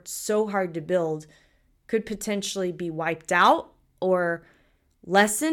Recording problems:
abrupt cut into speech; at the end

